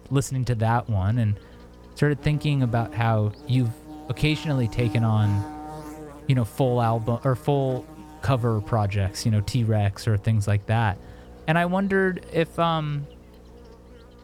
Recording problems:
electrical hum; noticeable; throughout; 60 Hz, 15 dB below the speech

